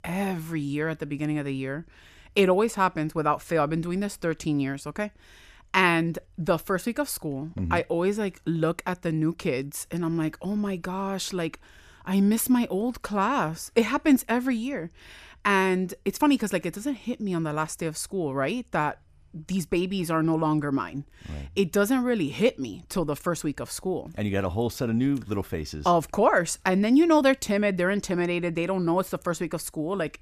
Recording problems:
none

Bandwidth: 14.5 kHz